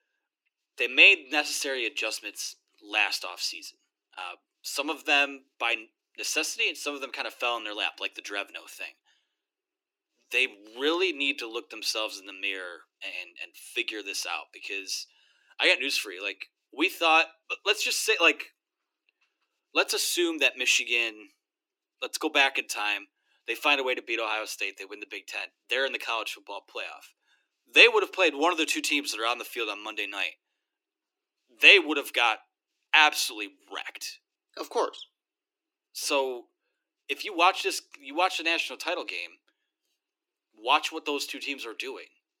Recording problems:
thin; somewhat; fading below 300 Hz

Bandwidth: 17 kHz